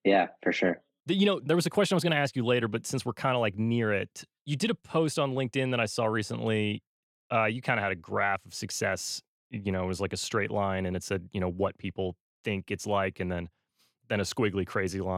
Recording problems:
abrupt cut into speech; at the end

